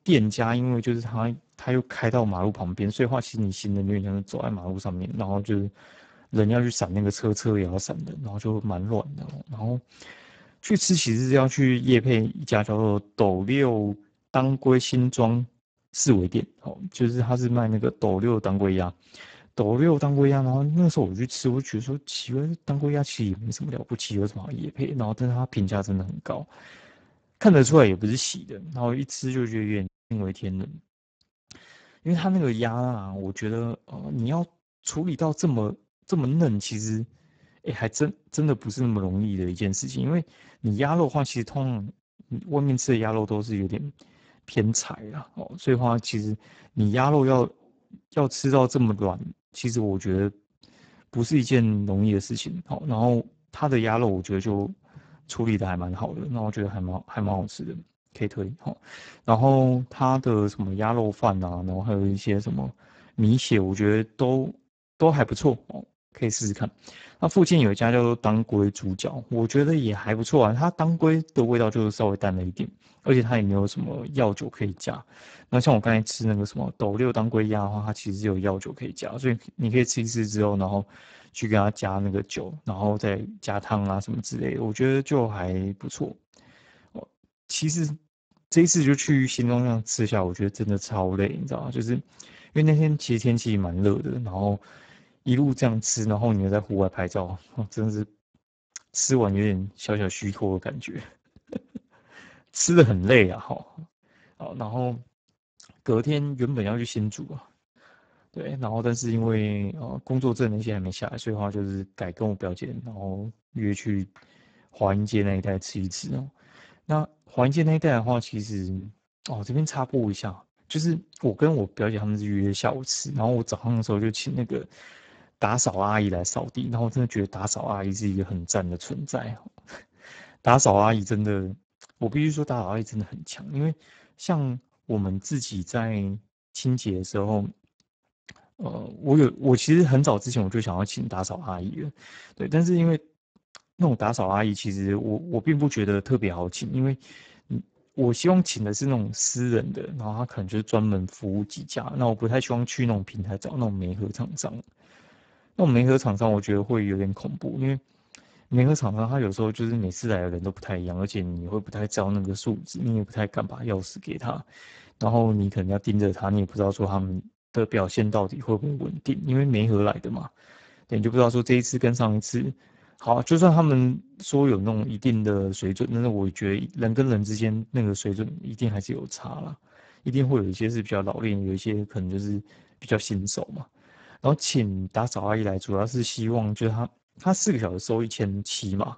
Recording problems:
garbled, watery; badly; nothing above 7.5 kHz
audio cutting out; at 30 s

